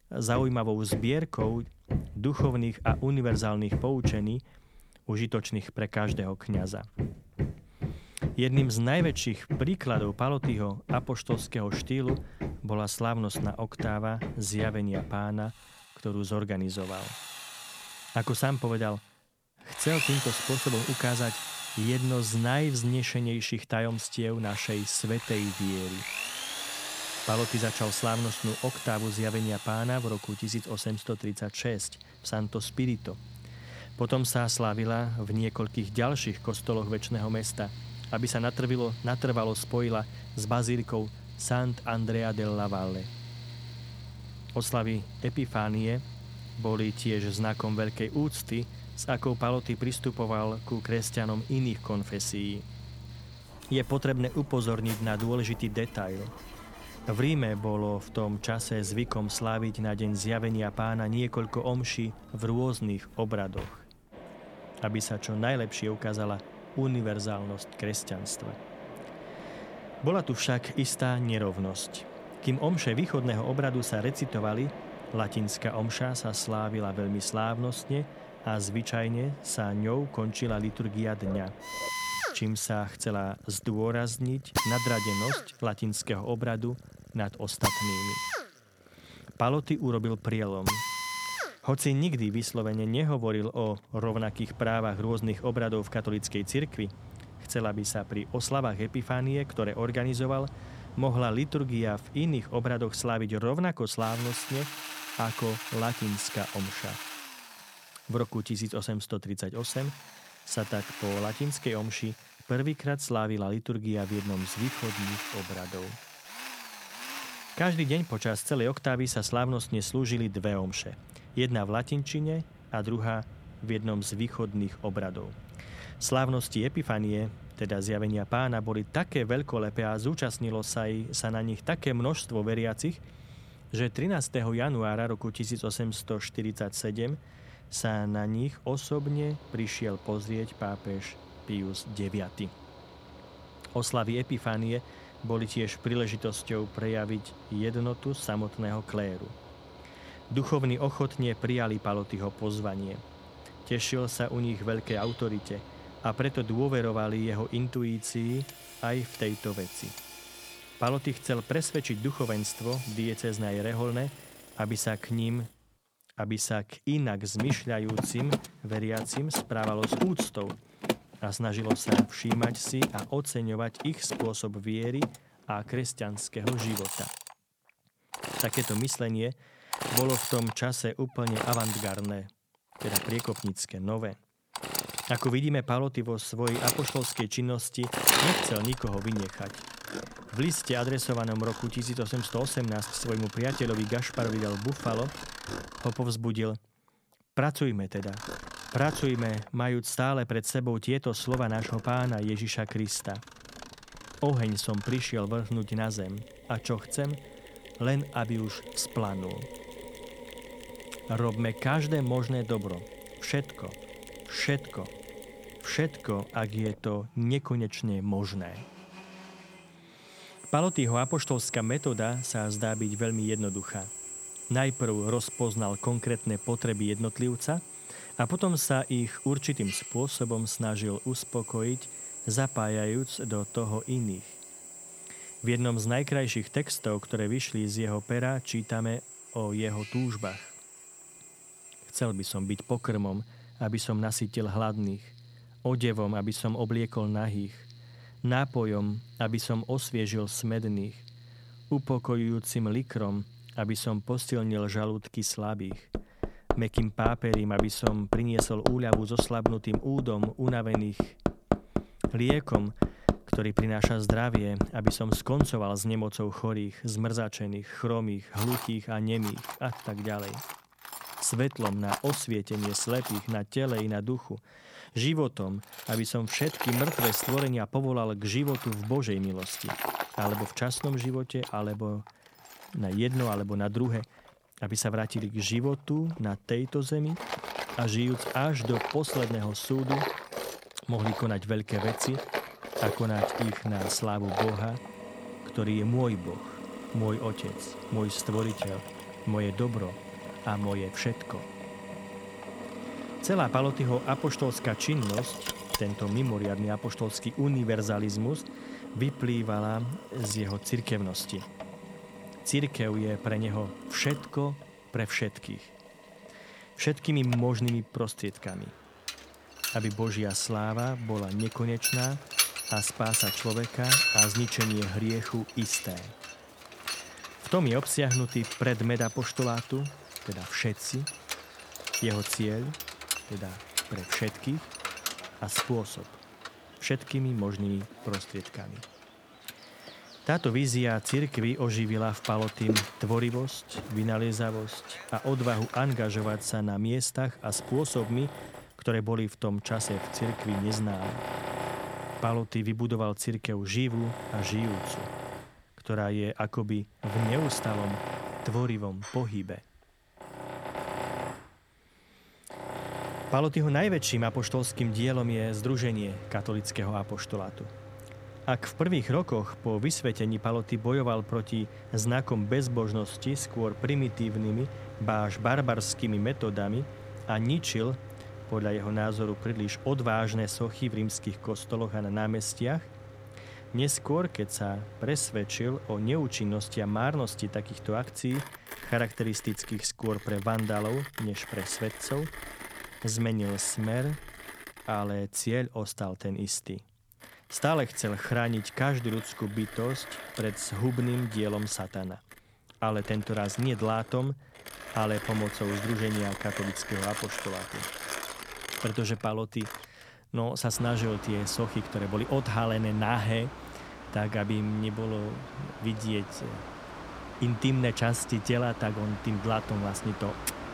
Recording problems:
machinery noise; loud; throughout; 6 dB below the speech

